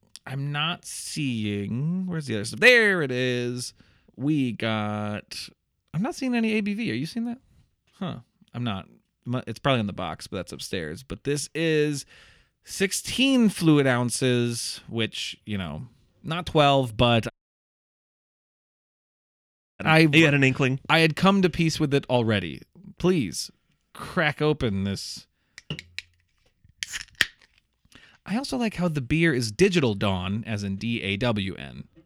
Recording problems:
audio cutting out; at 17 s for 2.5 s

